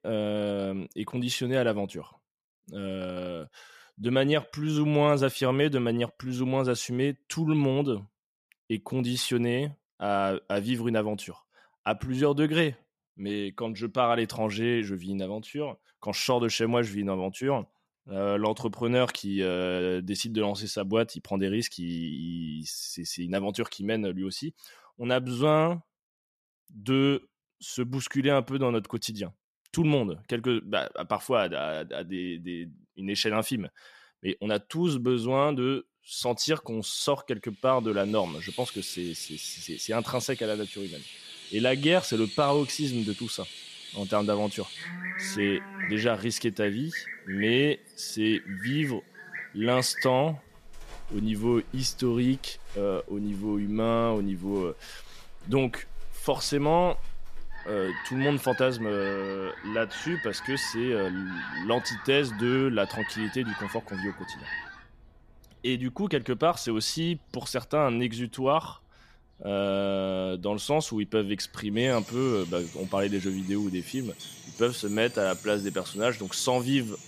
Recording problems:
animal sounds; noticeable; from 38 s on; 10 dB below the speech

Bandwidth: 14.5 kHz